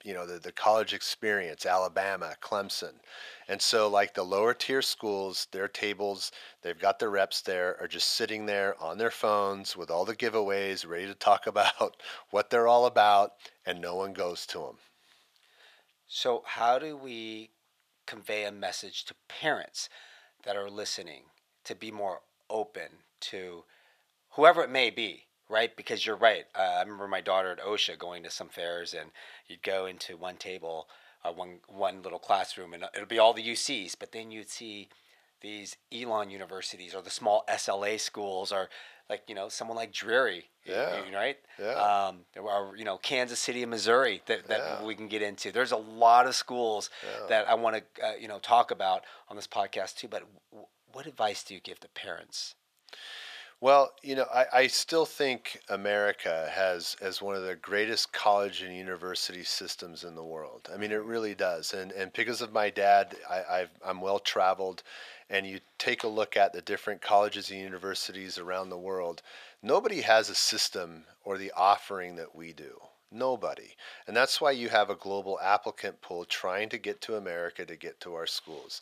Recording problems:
thin; very; fading below 450 Hz

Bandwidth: 14.5 kHz